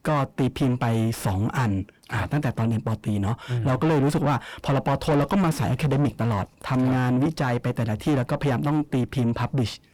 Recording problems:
distortion; heavy; 4 dB below the speech

